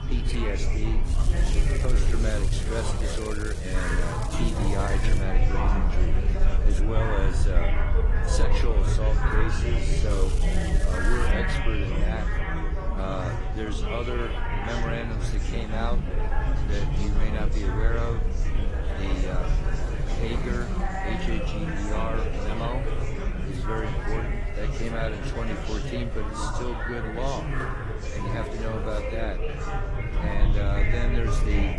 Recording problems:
garbled, watery; slightly; nothing above 10 kHz
chatter from many people; very loud; throughout; 1 dB above the speech
crackling; loud; from 1 to 5 s and from 10 to 11 s; 9 dB below the speech
traffic noise; noticeable; throughout; 10 dB below the speech
wind noise on the microphone; occasional gusts; 15 dB below the speech

